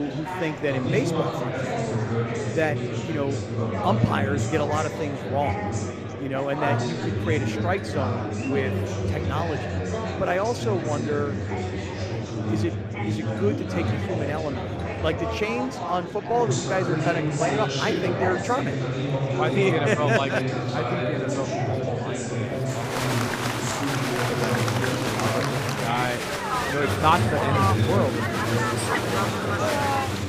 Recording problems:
murmuring crowd; very loud; throughout; 2 dB above the speech
alarms or sirens; faint; throughout; 30 dB below the speech
traffic noise; faint; throughout; 30 dB below the speech
abrupt cut into speech; at the start

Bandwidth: 15 kHz